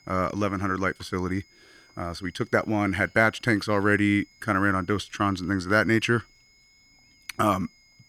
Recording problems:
high-pitched whine; faint; throughout; 2 kHz, 30 dB below the speech

